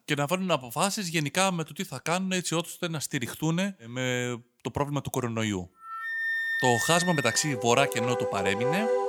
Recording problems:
background music; loud; from 6 s on; 2 dB below the speech

